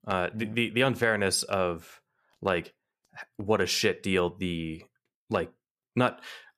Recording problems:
none

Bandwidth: 14.5 kHz